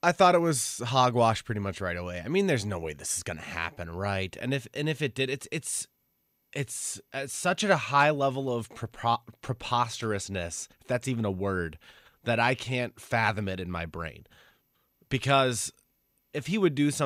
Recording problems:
abrupt cut into speech; at the end

